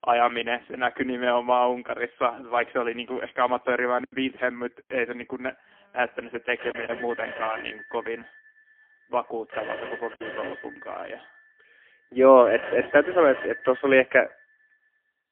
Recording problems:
phone-call audio; poor line; nothing above 3.5 kHz
alarms or sirens; noticeable; throughout; 15 dB below the speech
choppy; occasionally; 2% of the speech affected

